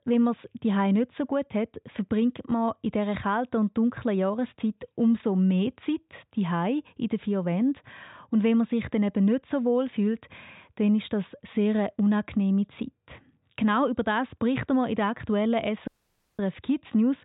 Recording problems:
high frequencies cut off; severe; nothing above 4 kHz
audio cutting out; at 16 s for 0.5 s

